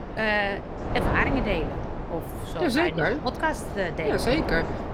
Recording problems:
wind noise on the microphone; heavy; 7 dB below the speech
background chatter; noticeable; throughout; 2 voices, 20 dB below the speech

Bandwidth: 17.5 kHz